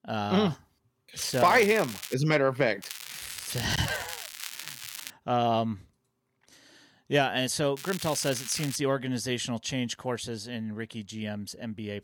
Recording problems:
crackling; noticeable; at 1 s, from 3 to 5 s and at 8 s; 10 dB below the speech

